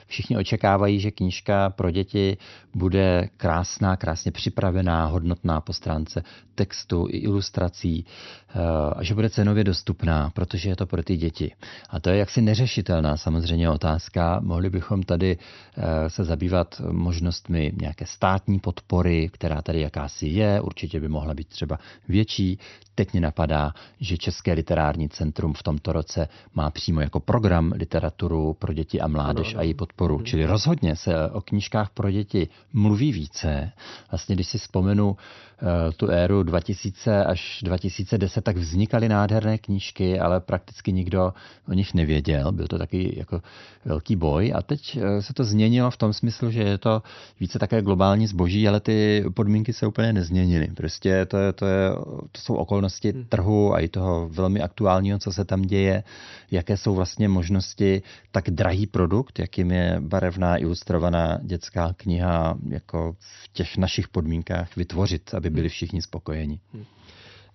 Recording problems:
high frequencies cut off; noticeable; nothing above 6 kHz

